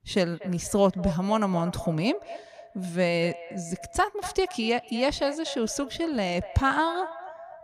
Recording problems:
echo of what is said; noticeable; throughout; 240 ms later, 15 dB below the speech

